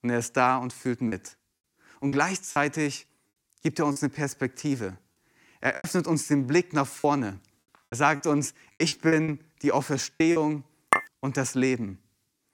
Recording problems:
choppy; very; 8% of the speech affected
clattering dishes; loud; at 11 s; peak 1 dB above the speech

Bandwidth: 17 kHz